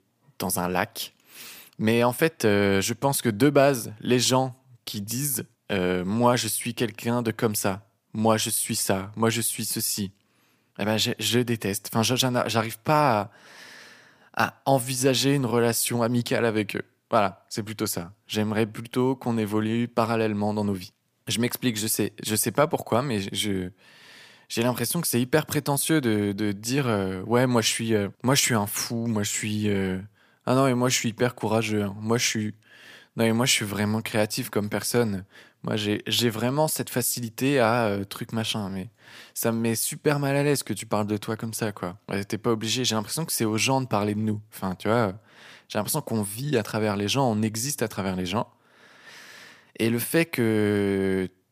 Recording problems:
none

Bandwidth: 15 kHz